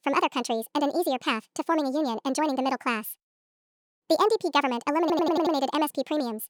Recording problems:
wrong speed and pitch; too fast and too high; 1.6 times normal speed
audio stuttering; at 5 s

